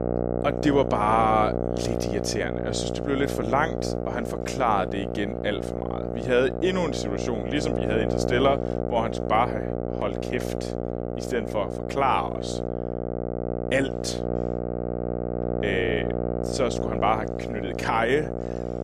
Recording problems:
electrical hum; loud; throughout; 60 Hz, 5 dB below the speech

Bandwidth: 14.5 kHz